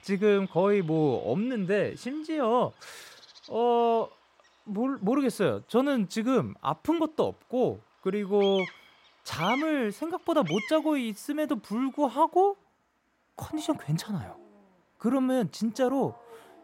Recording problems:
animal sounds; noticeable; throughout; 15 dB below the speech

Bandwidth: 16 kHz